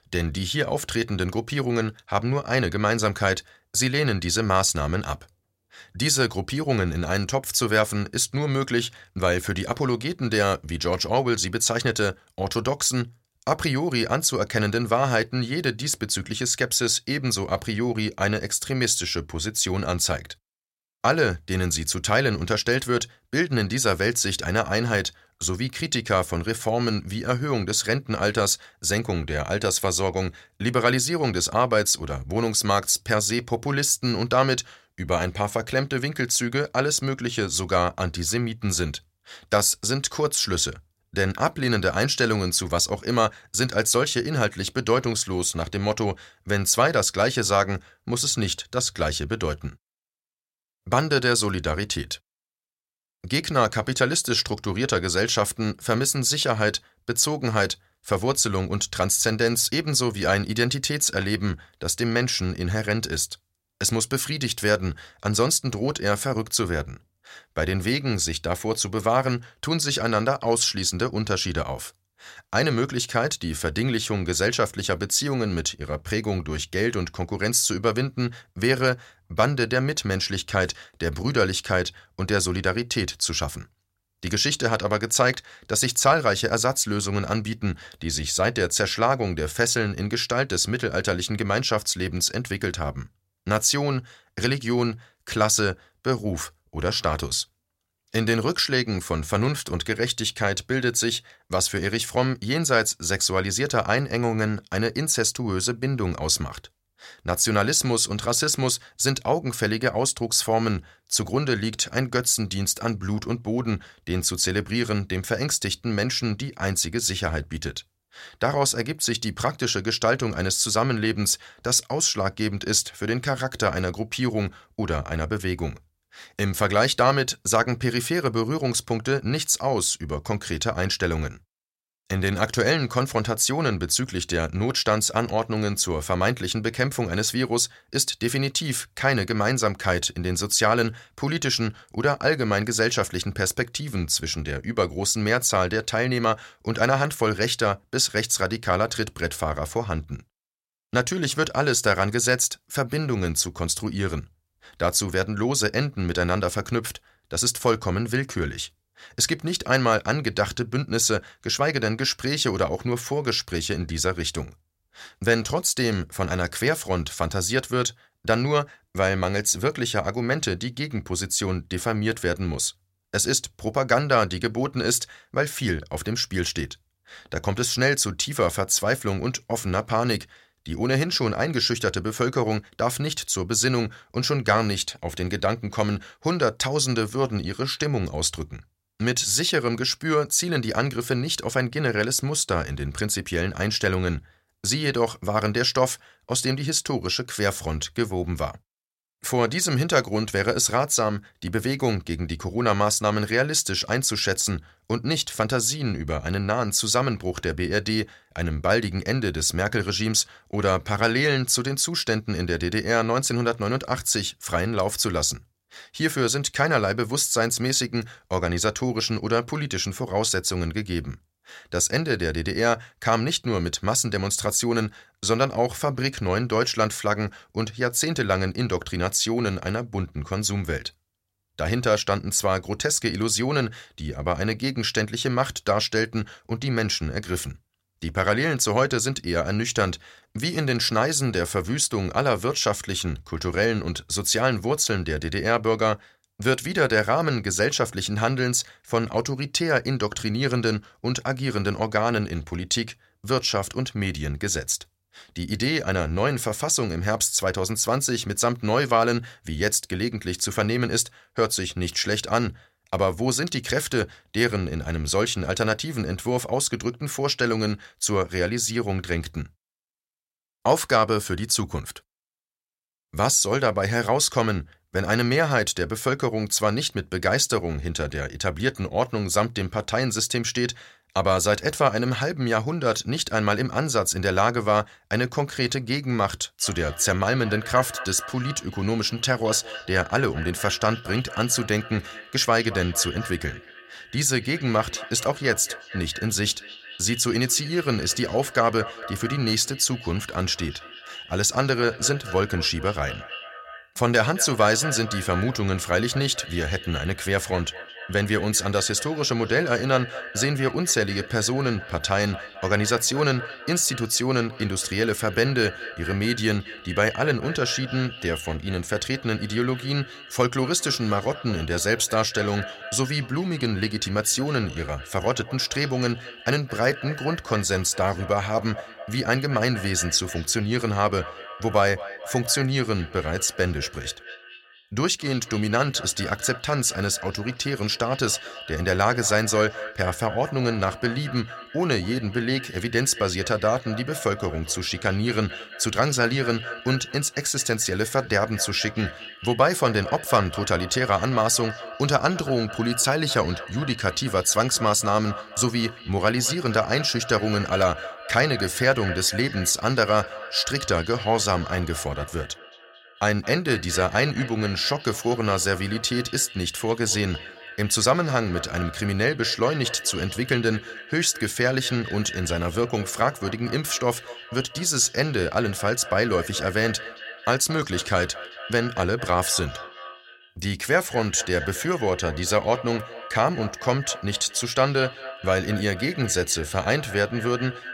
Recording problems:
echo of what is said; noticeable; from 4:47 on; 220 ms later, 15 dB below the speech

